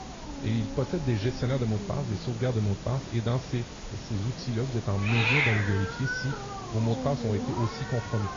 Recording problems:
garbled, watery; slightly; nothing above 6 kHz
hiss; loud; throughout; 3 dB below the speech

